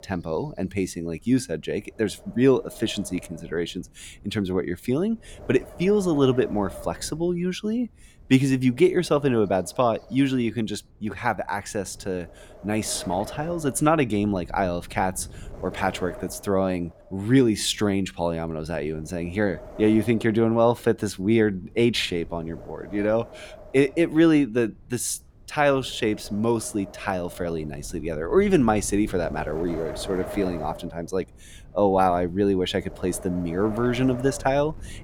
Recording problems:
wind noise on the microphone; occasional gusts; 15 dB below the speech

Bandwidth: 17 kHz